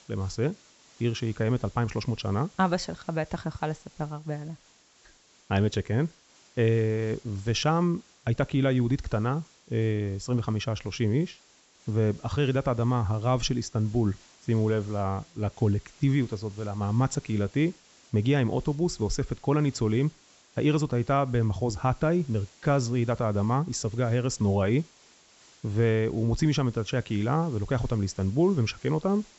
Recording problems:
high frequencies cut off; noticeable; nothing above 7.5 kHz
hiss; faint; throughout; 25 dB below the speech

